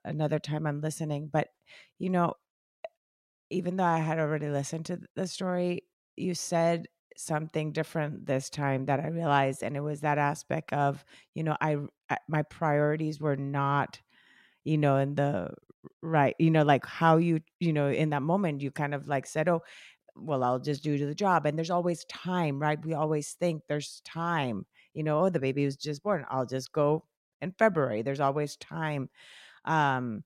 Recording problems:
none

